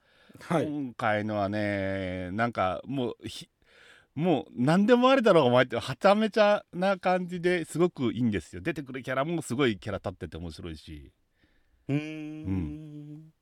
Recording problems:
none

